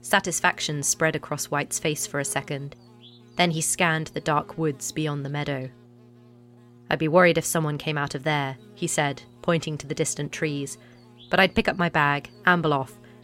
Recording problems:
electrical hum; faint; throughout; 60 Hz, 30 dB below the speech

